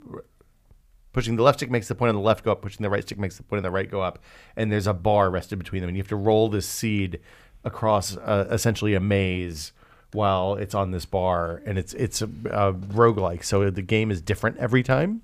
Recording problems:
none

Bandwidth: 15 kHz